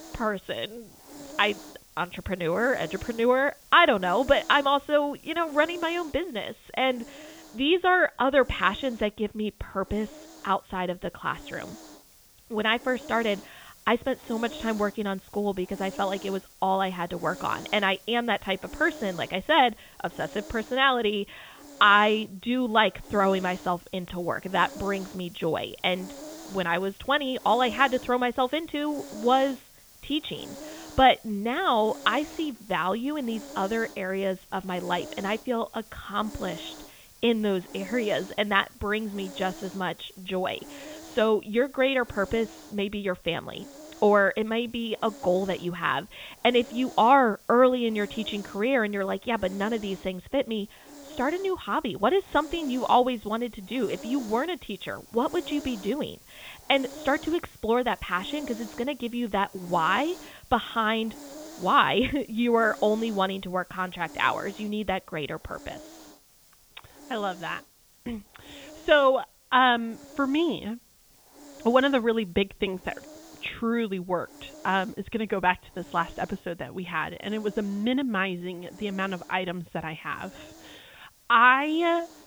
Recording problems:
high frequencies cut off; severe; nothing above 4 kHz
hiss; noticeable; throughout; 20 dB below the speech

